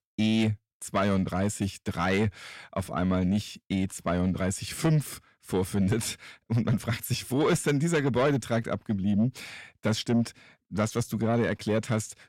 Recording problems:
distortion; slight; 10 dB below the speech

